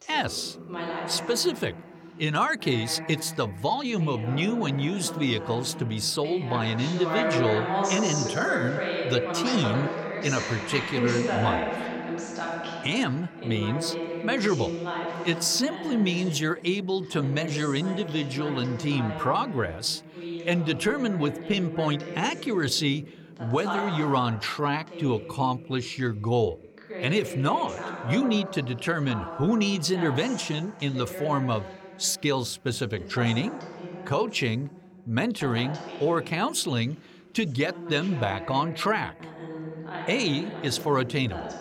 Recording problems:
voice in the background; loud; throughout; 7 dB below the speech

